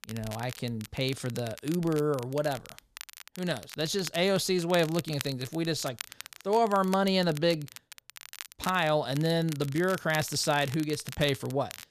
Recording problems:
crackle, like an old record; noticeable; 15 dB below the speech

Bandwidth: 14.5 kHz